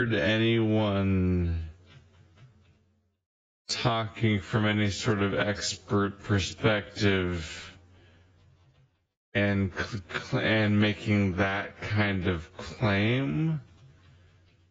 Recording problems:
garbled, watery; badly; nothing above 7.5 kHz
wrong speed, natural pitch; too slow; 0.6 times normal speed
abrupt cut into speech; at the start

